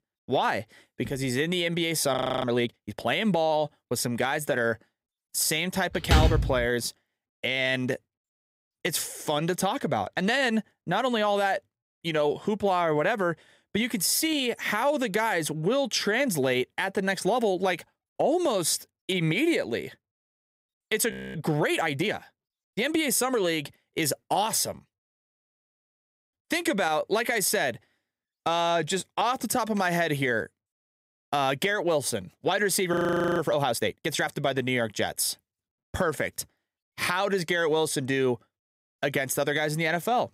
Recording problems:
audio freezing; at 2 s, at 21 s and at 33 s
door banging; loud; at 6 s; peak 4 dB above the speech

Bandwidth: 15.5 kHz